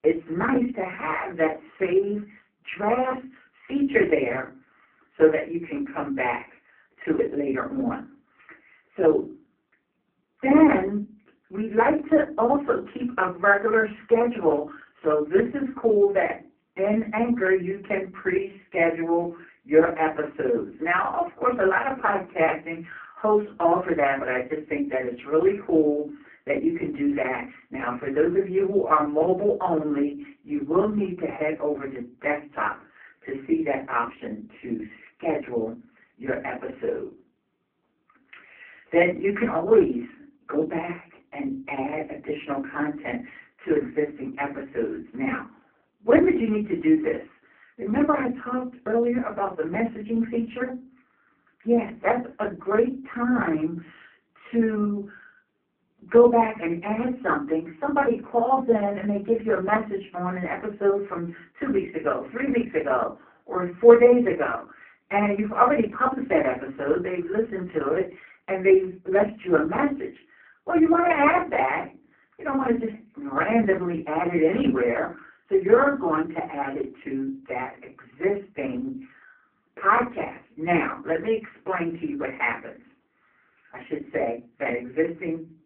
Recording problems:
phone-call audio; poor line
off-mic speech; far
muffled; very; fading above 2.5 kHz
room echo; very slight; dies away in 0.3 s

